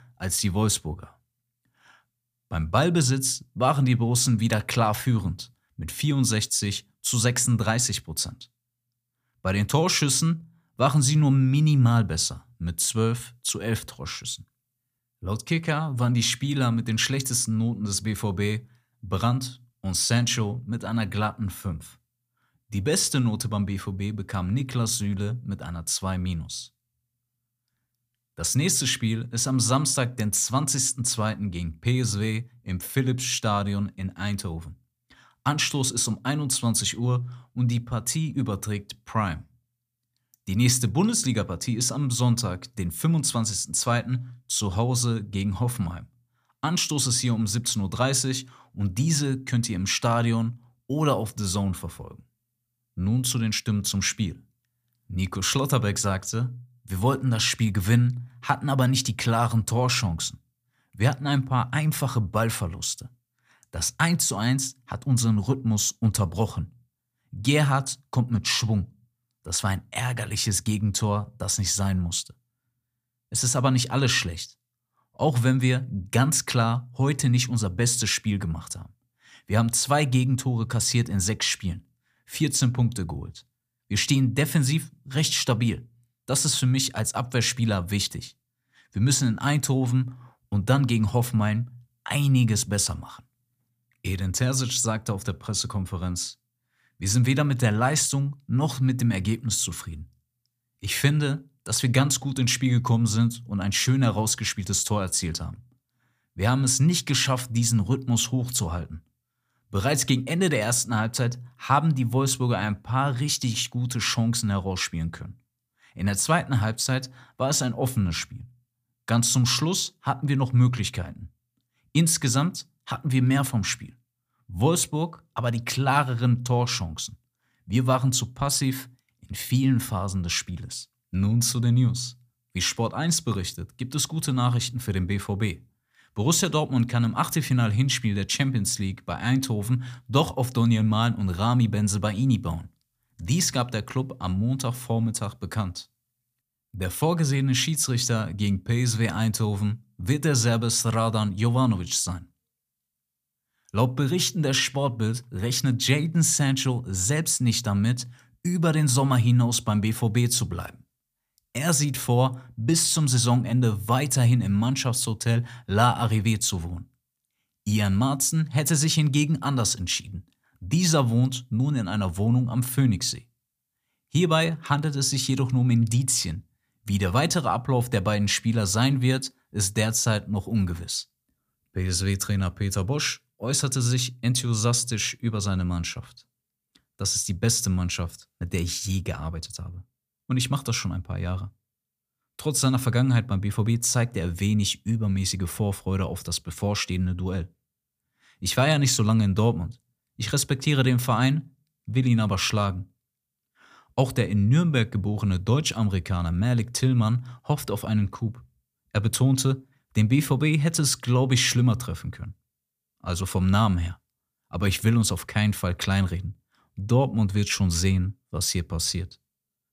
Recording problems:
none

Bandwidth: 15 kHz